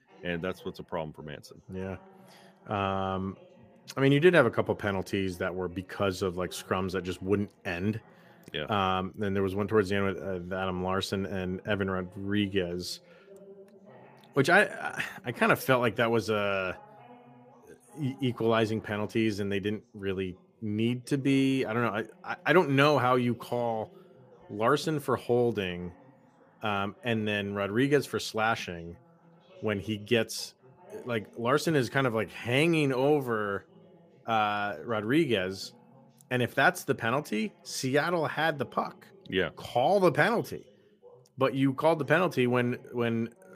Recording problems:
background chatter; faint; throughout; 3 voices, 25 dB below the speech

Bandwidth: 15 kHz